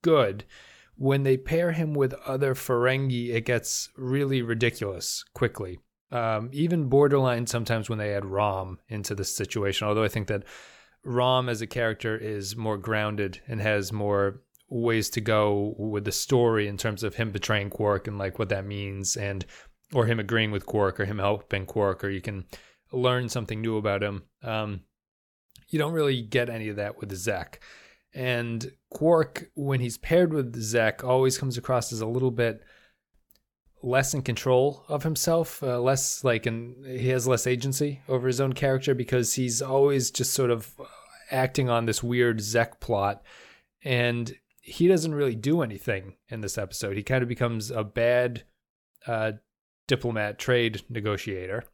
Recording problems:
none

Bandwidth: 18.5 kHz